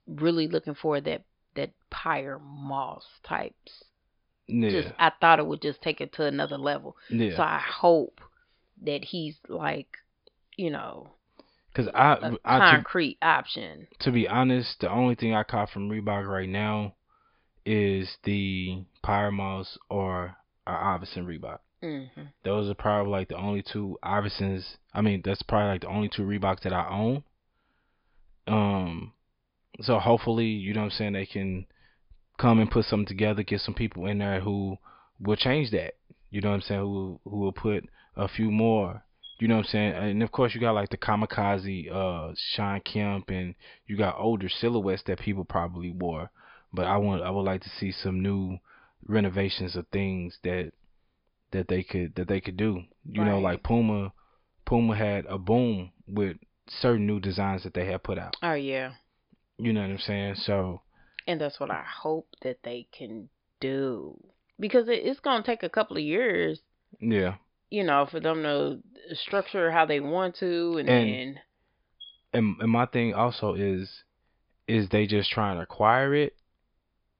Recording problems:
high frequencies cut off; noticeable; nothing above 5 kHz

